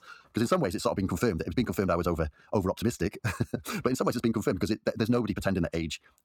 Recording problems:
wrong speed, natural pitch; too fast; 1.6 times normal speed

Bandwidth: 17.5 kHz